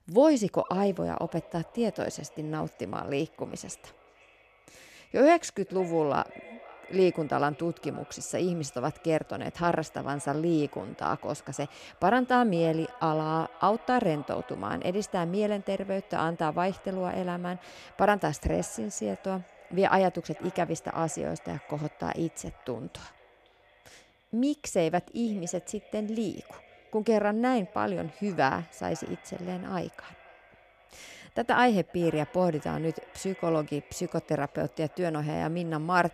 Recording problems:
echo of what is said; faint; throughout; 510 ms later, 20 dB below the speech

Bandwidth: 14.5 kHz